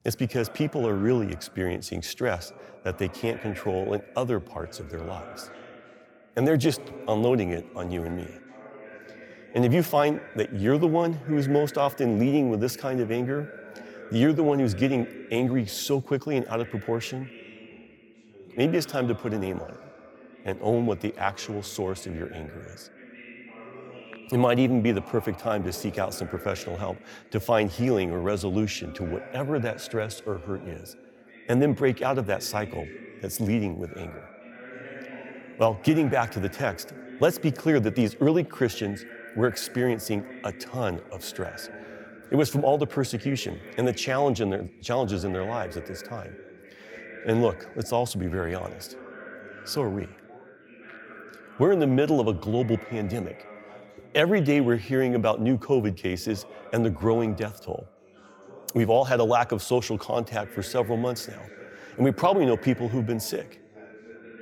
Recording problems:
background chatter; noticeable; throughout; 2 voices, 20 dB below the speech

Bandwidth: 17.5 kHz